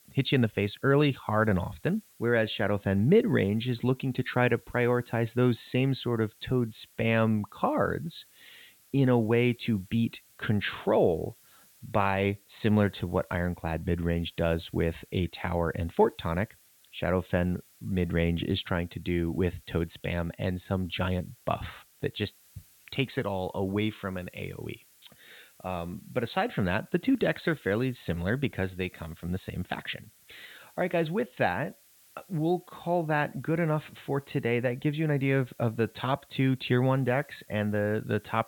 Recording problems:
high frequencies cut off; severe; nothing above 4 kHz
hiss; faint; throughout; 30 dB below the speech

